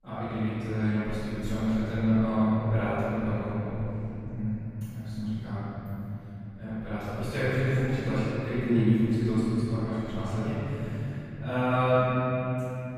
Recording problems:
room echo; strong; dies away in 3 s
off-mic speech; far

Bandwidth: 15 kHz